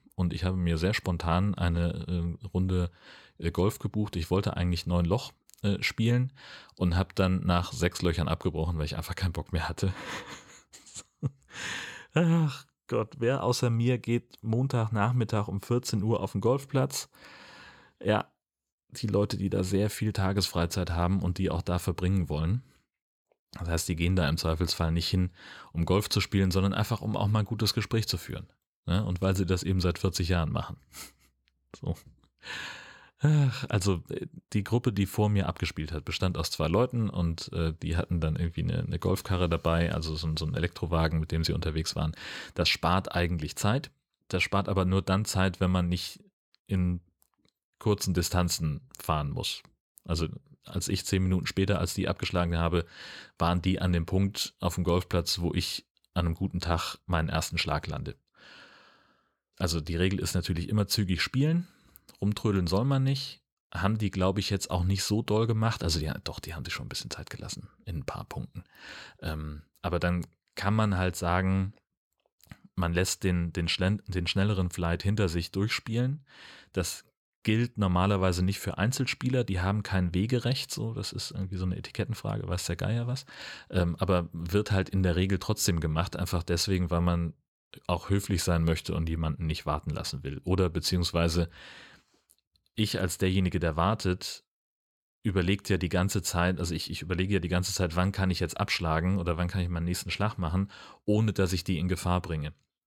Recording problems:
none

